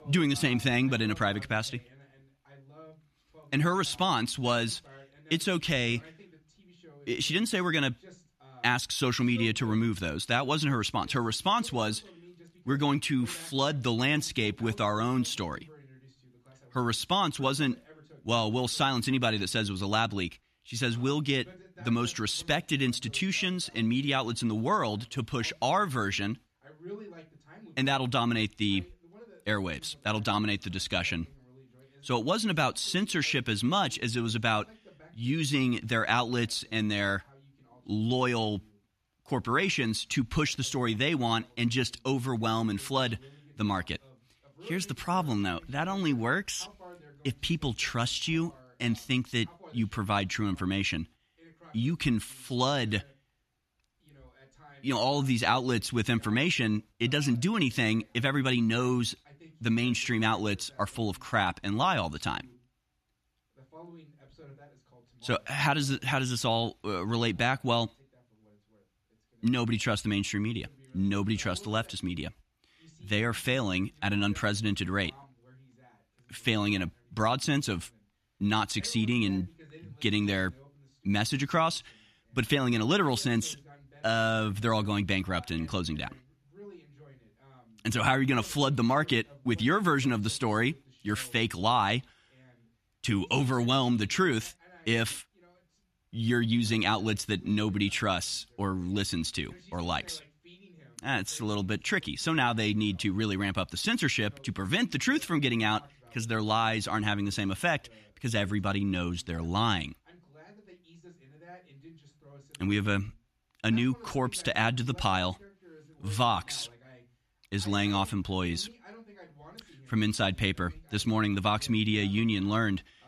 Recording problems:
voice in the background; faint; throughout; 25 dB below the speech

